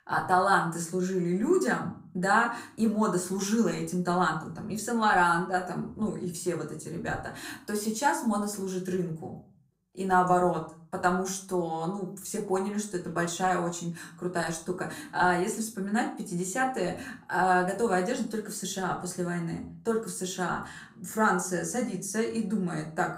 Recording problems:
room echo; slight; dies away in 0.4 s
off-mic speech; somewhat distant

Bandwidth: 15.5 kHz